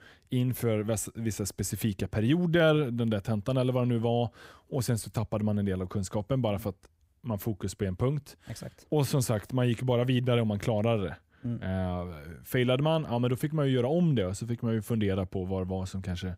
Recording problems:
none

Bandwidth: 15.5 kHz